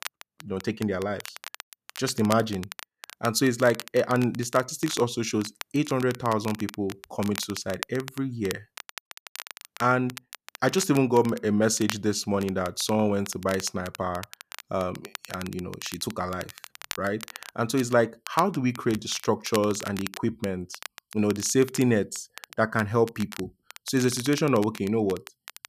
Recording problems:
crackle, like an old record; noticeable; 15 dB below the speech

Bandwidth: 14.5 kHz